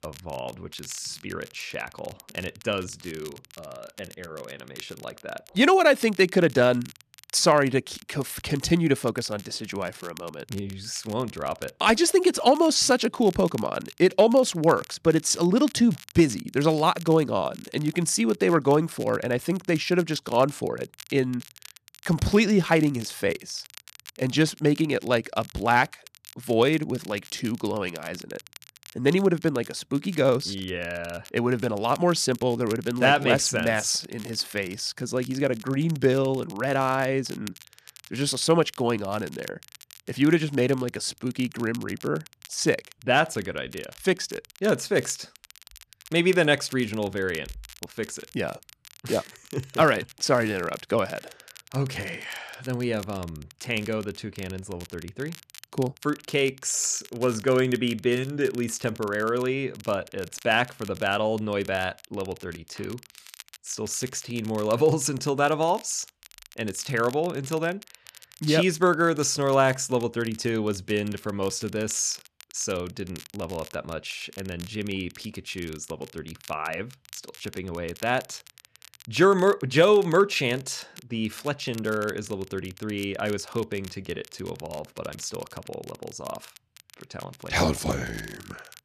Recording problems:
crackle, like an old record; faint; 20 dB below the speech

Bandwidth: 14 kHz